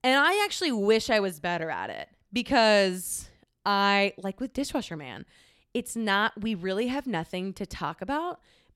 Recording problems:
none

